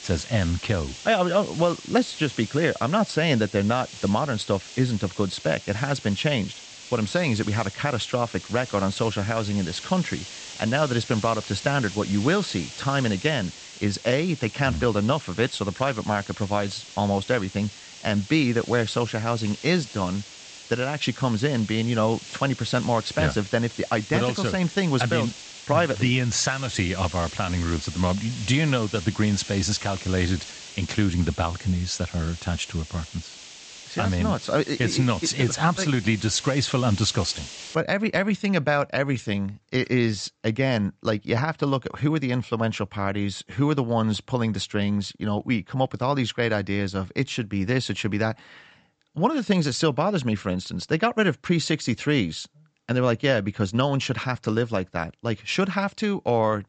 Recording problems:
high frequencies cut off; noticeable; nothing above 8 kHz
hiss; noticeable; until 38 s; 15 dB below the speech

